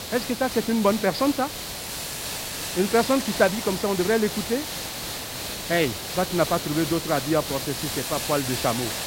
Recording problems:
high frequencies cut off; noticeable; nothing above 5.5 kHz
hiss; loud; throughout; 5 dB below the speech

